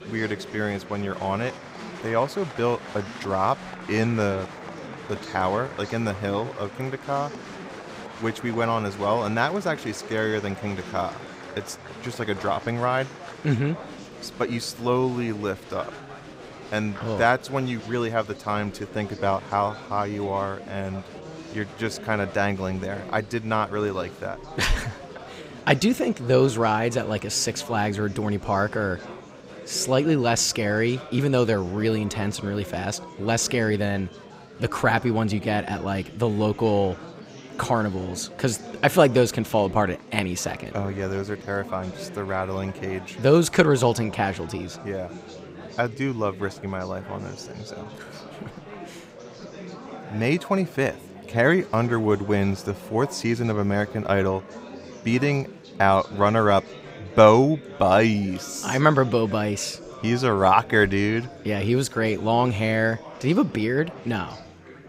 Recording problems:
murmuring crowd; noticeable; throughout; 15 dB below the speech

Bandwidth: 15.5 kHz